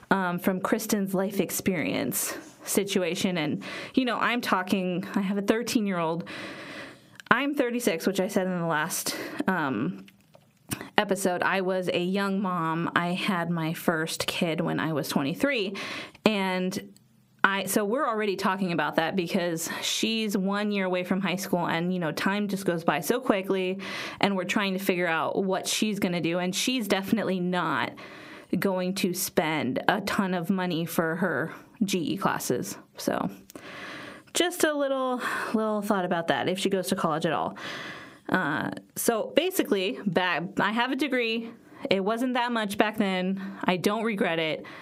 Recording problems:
squashed, flat; heavily

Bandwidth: 15.5 kHz